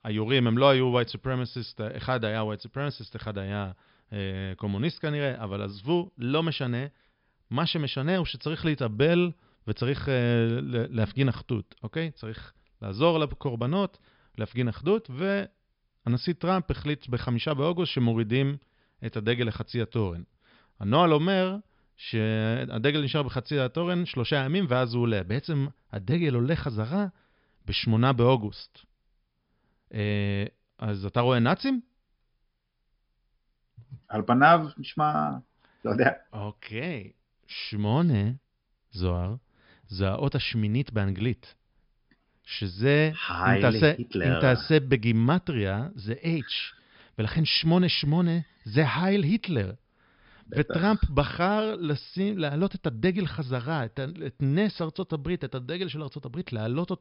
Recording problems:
high frequencies cut off; noticeable; nothing above 5.5 kHz

